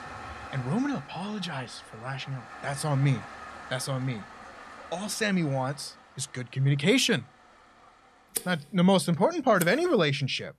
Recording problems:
household noises; noticeable; throughout; 15 dB below the speech

